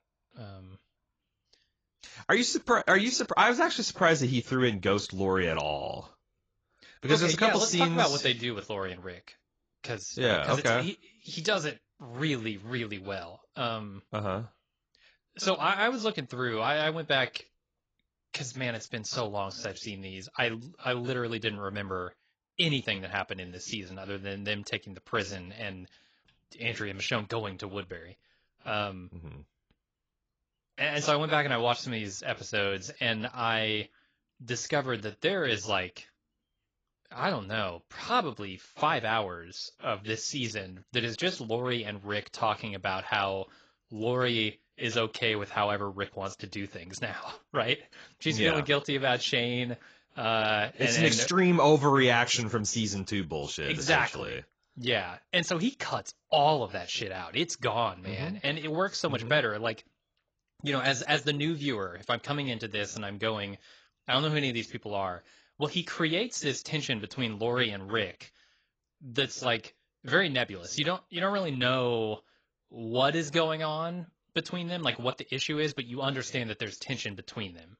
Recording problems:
garbled, watery; badly; nothing above 7.5 kHz

